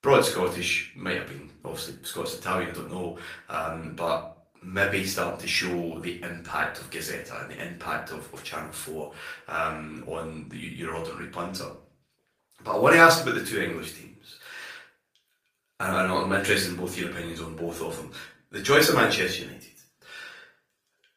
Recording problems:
off-mic speech; far
thin; somewhat; fading below 650 Hz
room echo; slight; dies away in 0.4 s
garbled, watery; slightly; nothing above 15 kHz

